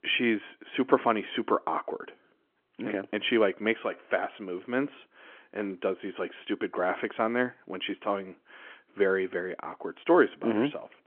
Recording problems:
phone-call audio; nothing above 3.5 kHz

